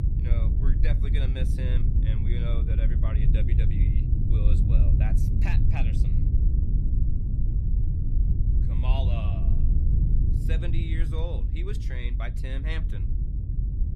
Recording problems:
low rumble; loud; throughout; 1 dB below the speech

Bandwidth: 15.5 kHz